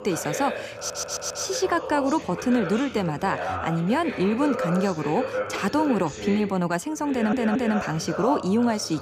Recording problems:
voice in the background; loud; throughout; 7 dB below the speech
audio stuttering; at 1 s and at 7 s

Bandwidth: 15 kHz